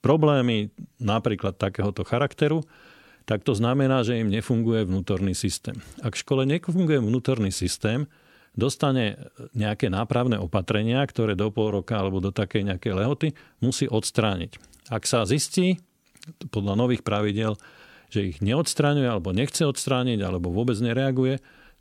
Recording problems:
none

